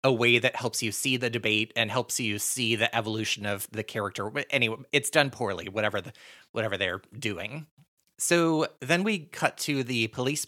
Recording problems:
none

